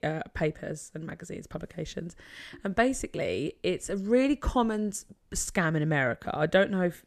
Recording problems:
none

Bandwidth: 14 kHz